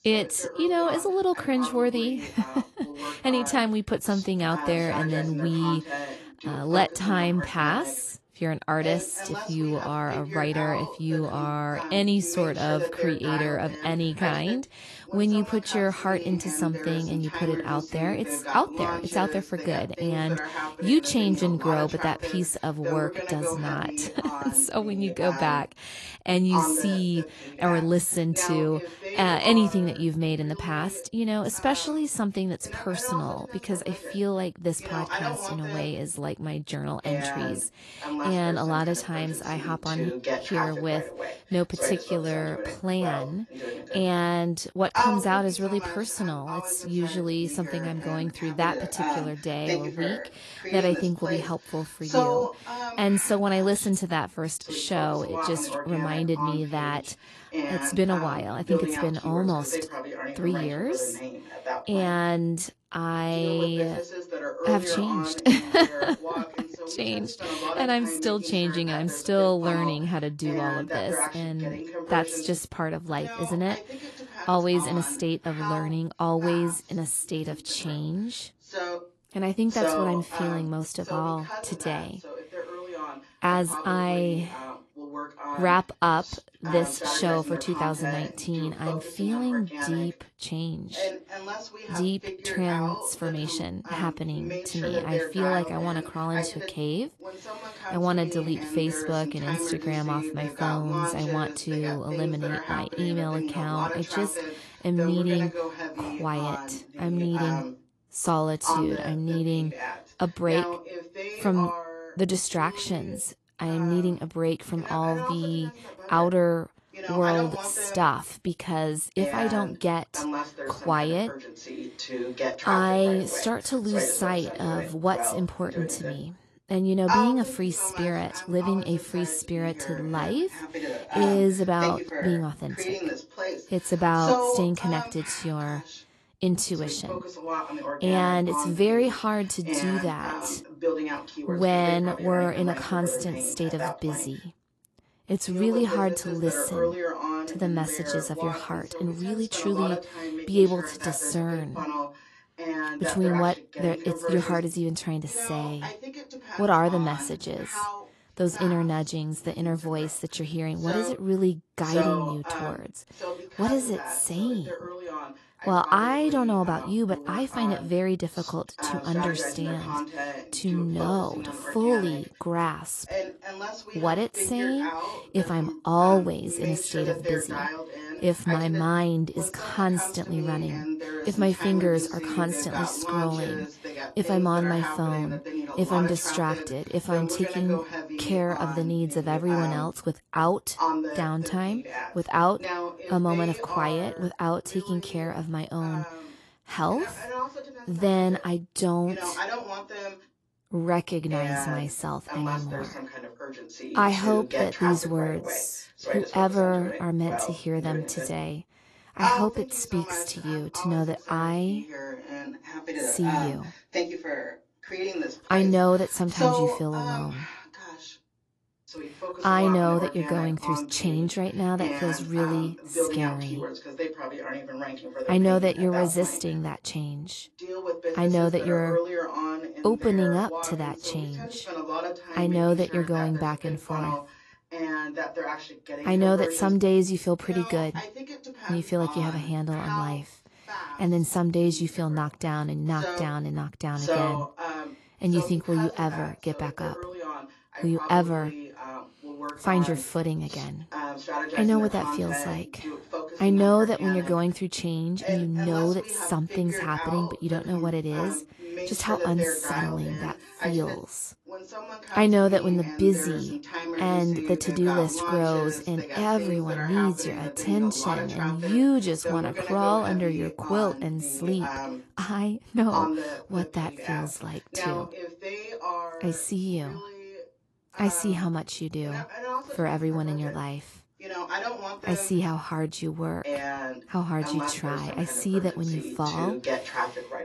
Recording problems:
garbled, watery; slightly; nothing above 11.5 kHz
voice in the background; loud; throughout; 7 dB below the speech

